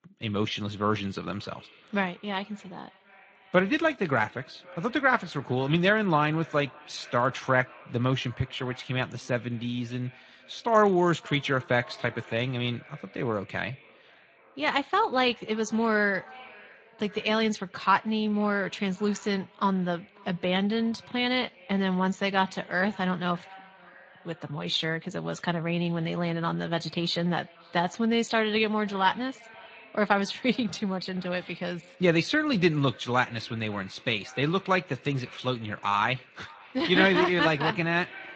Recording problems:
echo of what is said; faint; throughout; 530 ms later, 25 dB below the speech
garbled, watery; slightly; nothing above 7.5 kHz

